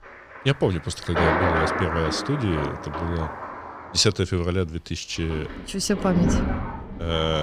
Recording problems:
rain or running water; loud; throughout; 2 dB below the speech
abrupt cut into speech; at the end

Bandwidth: 14.5 kHz